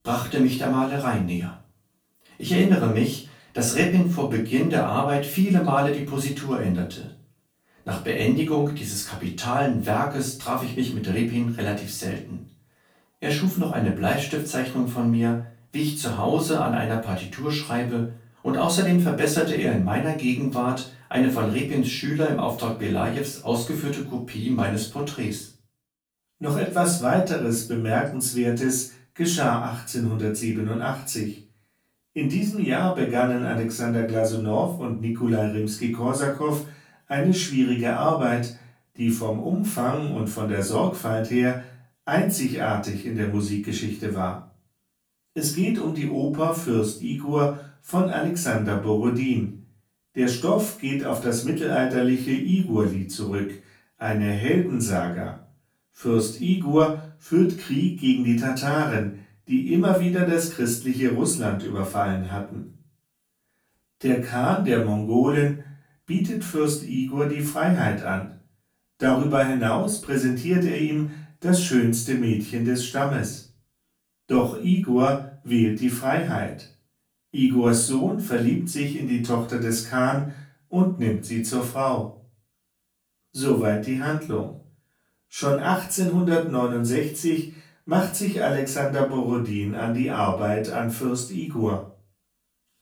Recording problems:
off-mic speech; far
room echo; slight; dies away in 0.3 s

